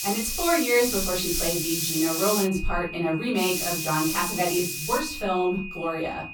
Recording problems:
off-mic speech; far
room echo; slight; dies away in 0.3 s
hiss; loud; until 2.5 s and from 3.5 to 5 s; 2 dB below the speech
high-pitched whine; noticeable; throughout; 2.5 kHz, 10 dB below the speech

